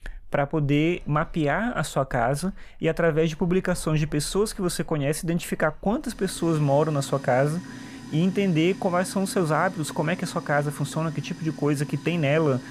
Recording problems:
household noises; noticeable; throughout; 15 dB below the speech

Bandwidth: 15 kHz